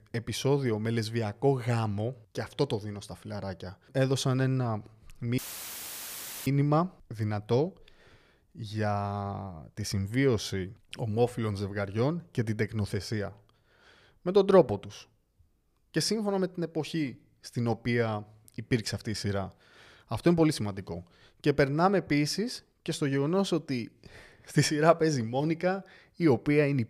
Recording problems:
audio cutting out; filled with static; at 5.5 s for 1 s

